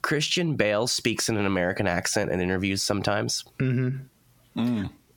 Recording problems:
squashed, flat; heavily

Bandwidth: 17 kHz